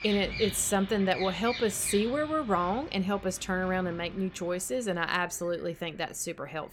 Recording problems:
animal sounds; noticeable; throughout; 10 dB below the speech

